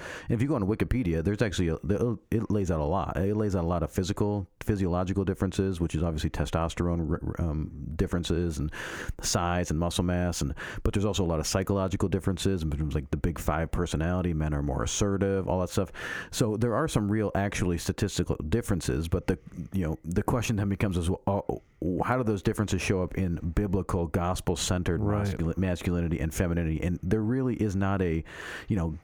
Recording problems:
squashed, flat; heavily

